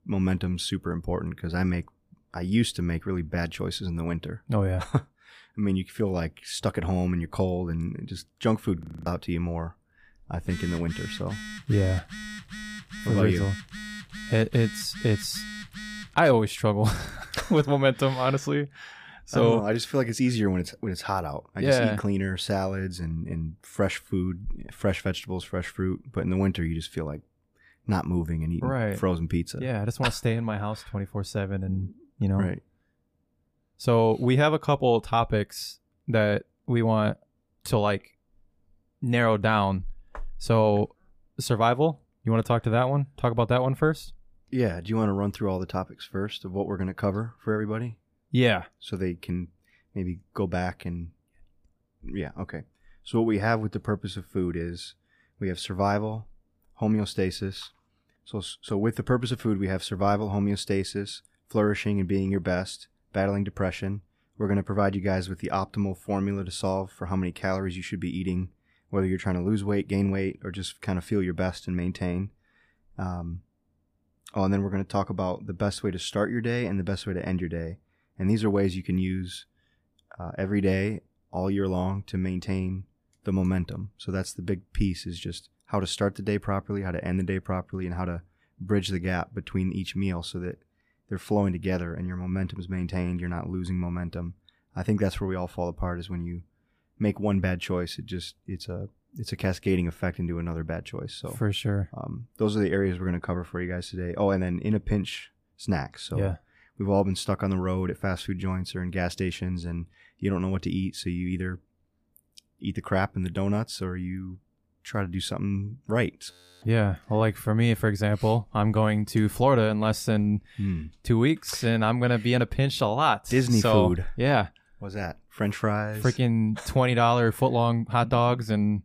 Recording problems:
audio freezing; at 9 s and at 1:56
phone ringing; faint; from 10 to 16 s; peak 10 dB below the speech

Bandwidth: 15 kHz